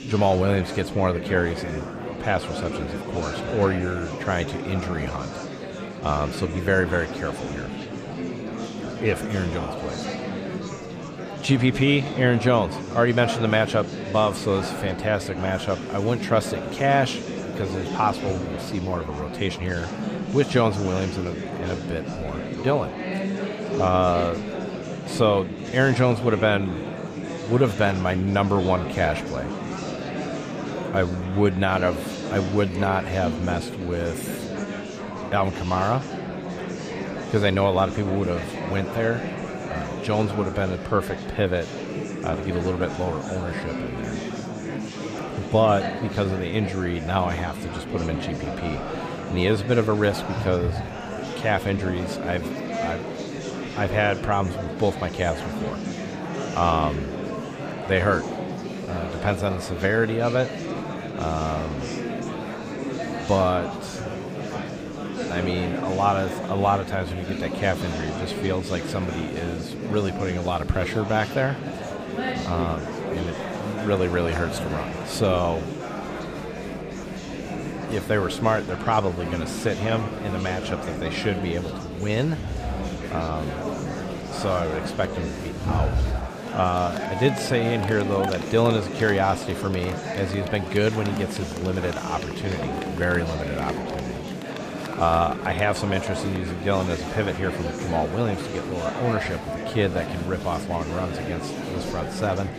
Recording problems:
murmuring crowd; loud; throughout; 6 dB below the speech

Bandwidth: 15 kHz